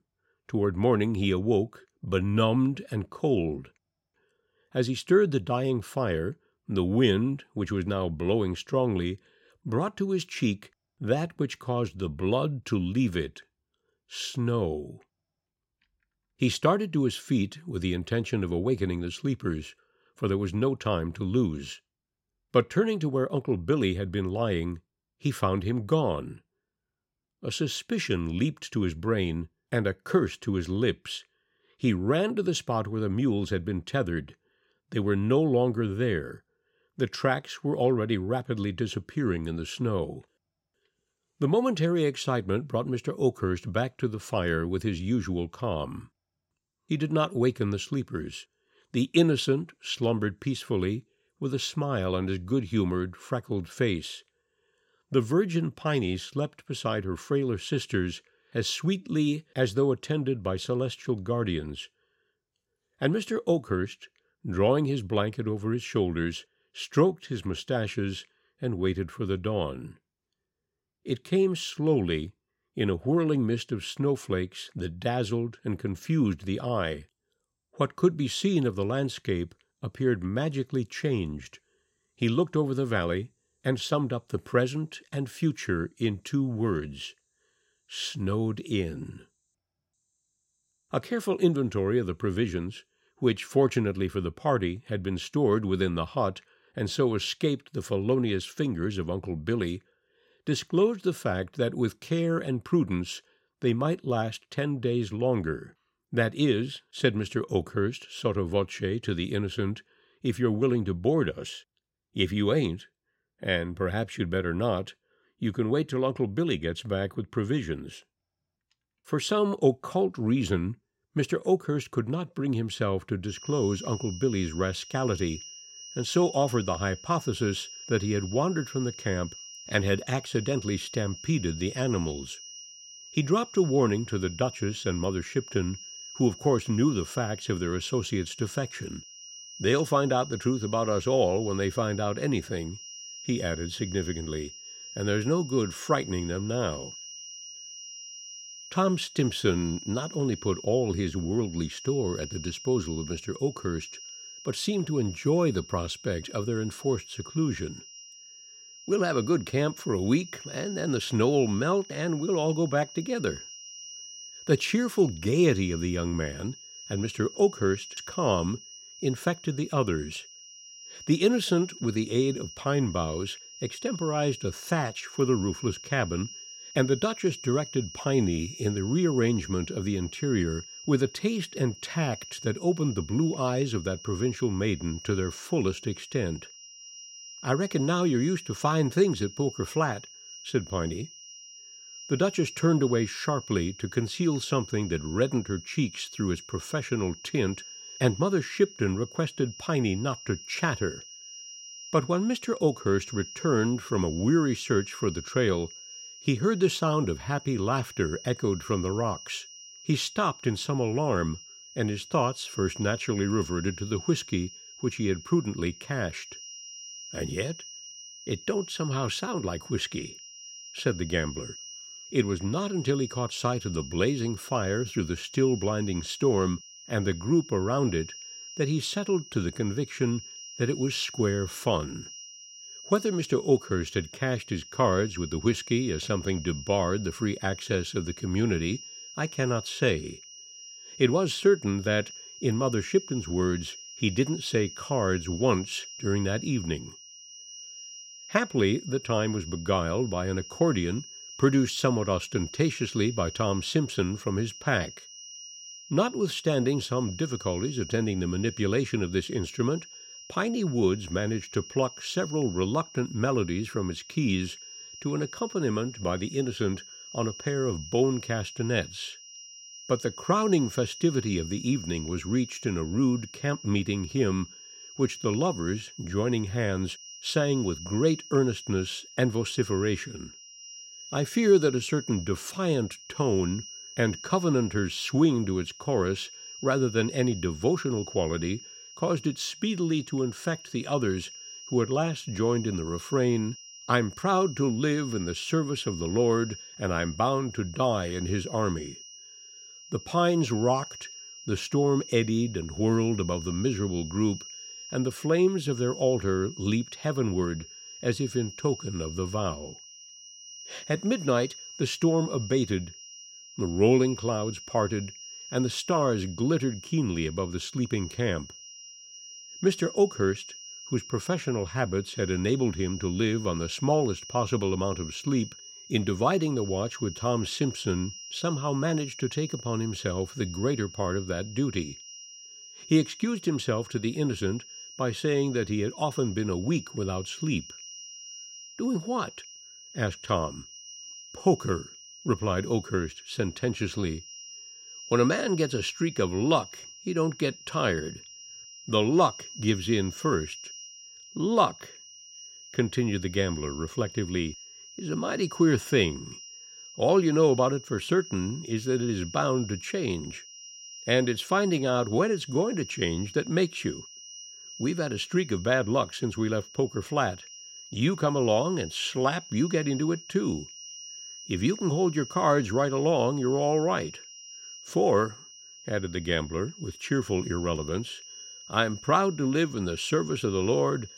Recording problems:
high-pitched whine; noticeable; from 2:03 on; 5.5 kHz, 15 dB below the speech

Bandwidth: 16 kHz